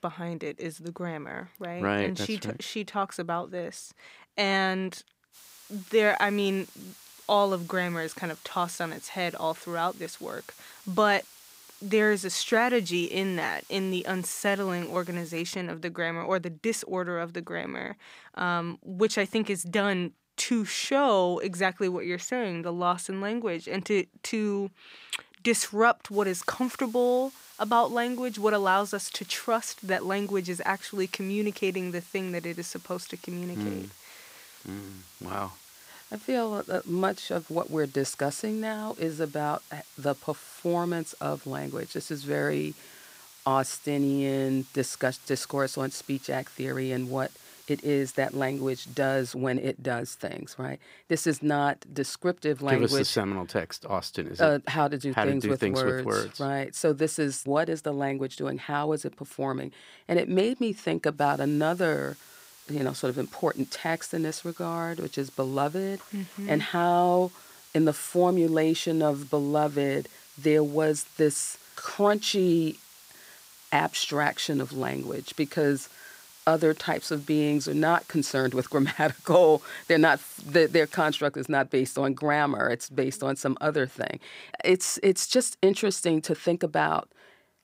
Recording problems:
hiss; faint; from 5.5 to 15 s, from 26 to 49 s and from 1:01 to 1:21; 20 dB below the speech

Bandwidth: 15.5 kHz